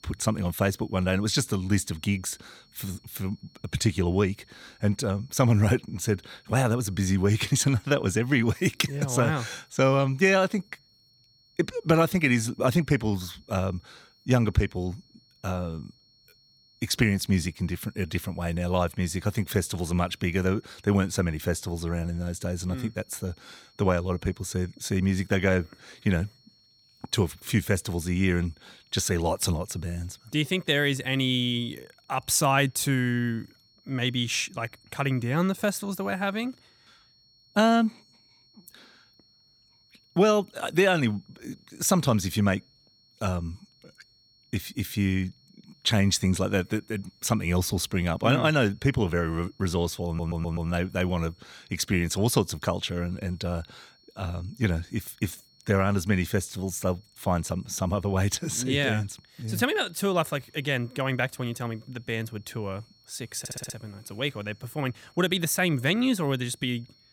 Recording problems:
high-pitched whine; faint; throughout; 4.5 kHz, 30 dB below the speech
audio stuttering; at 50 s and at 1:03

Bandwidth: 18 kHz